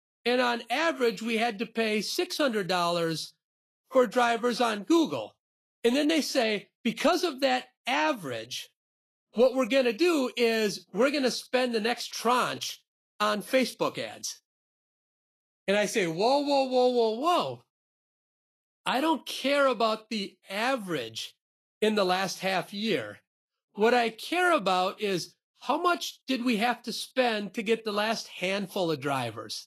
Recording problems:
garbled, watery; slightly; nothing above 12.5 kHz

